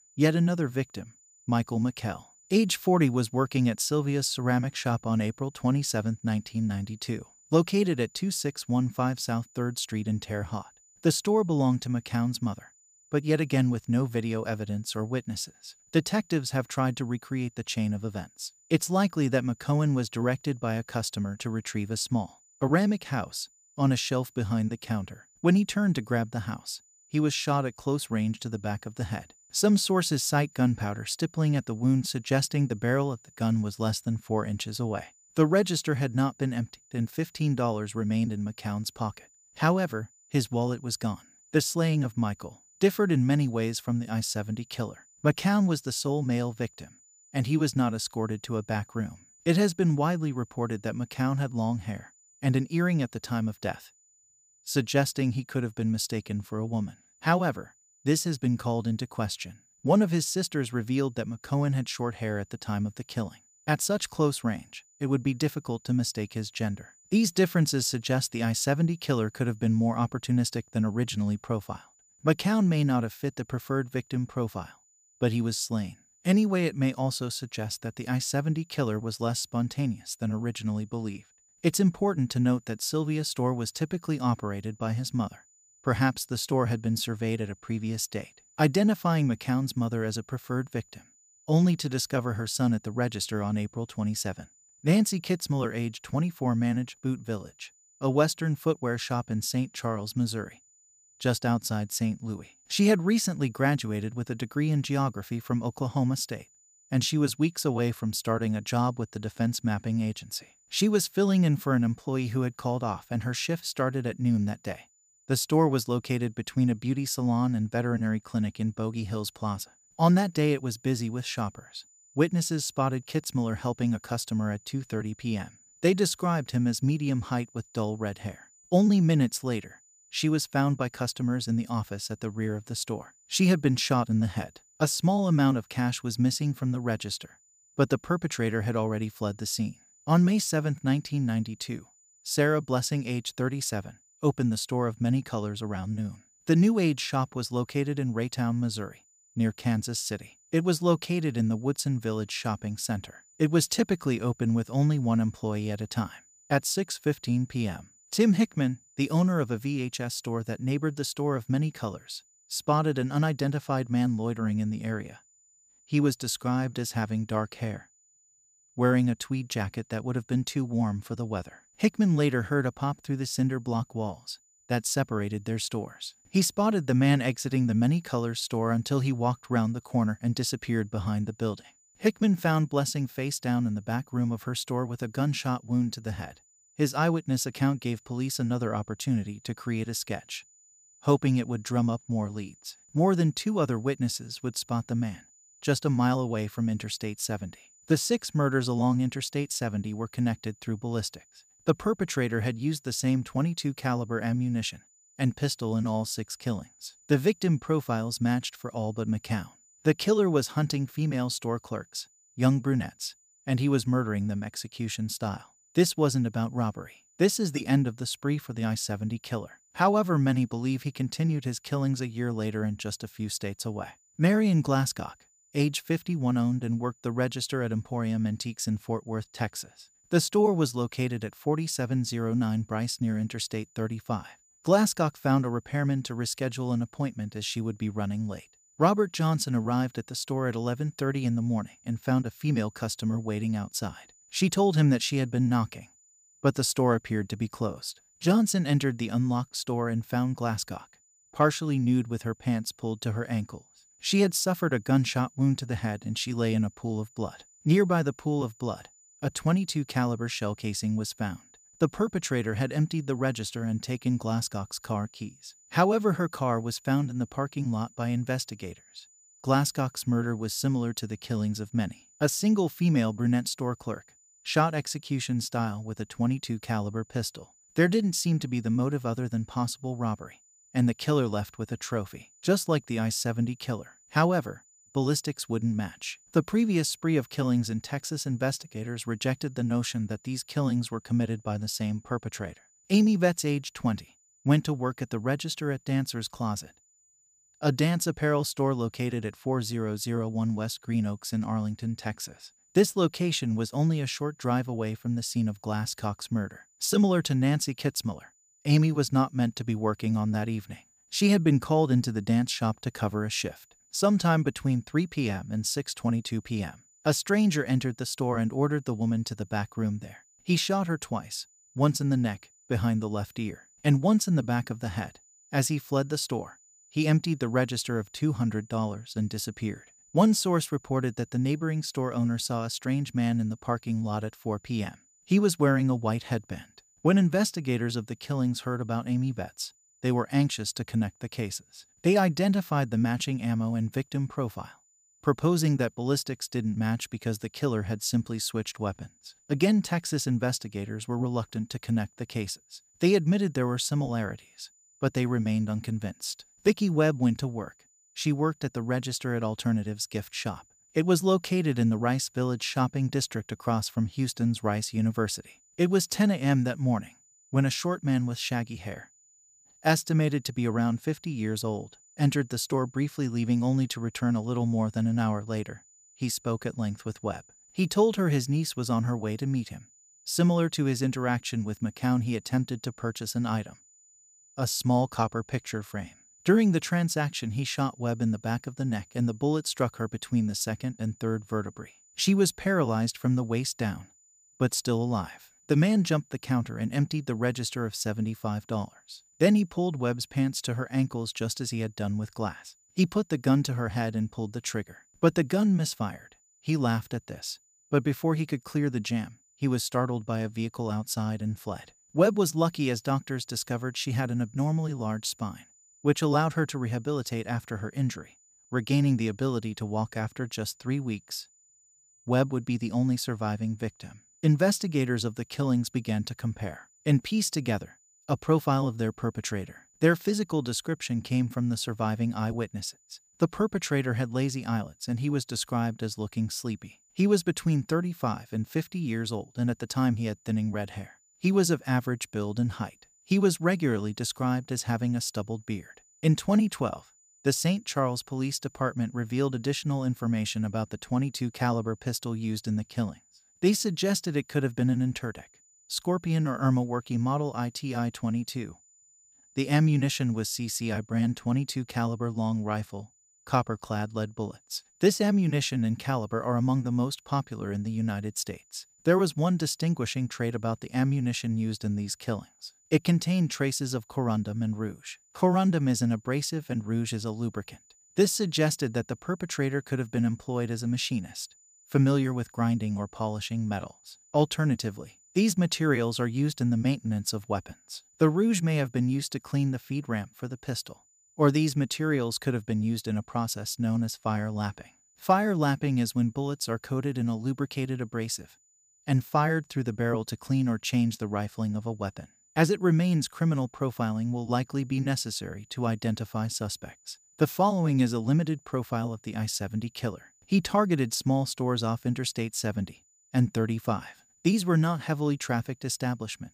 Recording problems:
high-pitched whine; faint; throughout; 7 kHz, 30 dB below the speech

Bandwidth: 15 kHz